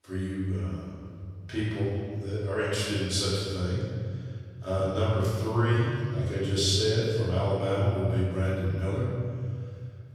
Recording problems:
room echo; strong; dies away in 2.1 s
off-mic speech; far

